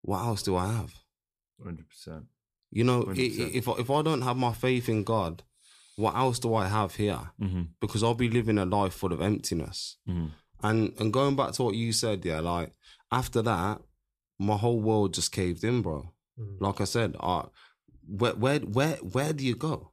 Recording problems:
none

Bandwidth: 14.5 kHz